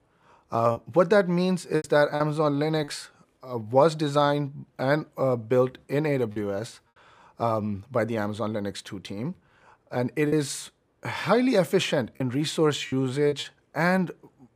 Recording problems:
choppy; occasionally; 4% of the speech affected

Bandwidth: 15 kHz